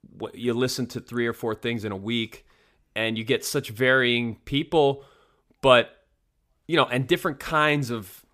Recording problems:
none

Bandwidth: 15 kHz